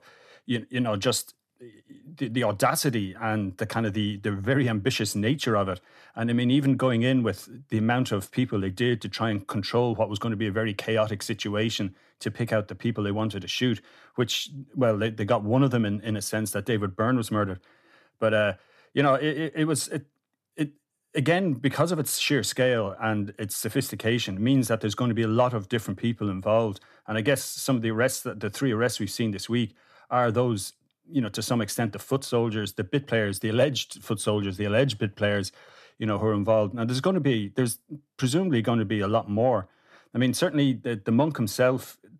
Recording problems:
none

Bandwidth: 14 kHz